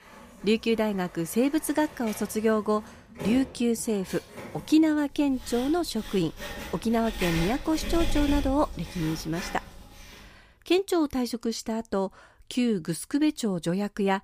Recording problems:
household noises; noticeable; until 10 s; 10 dB below the speech

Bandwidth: 15 kHz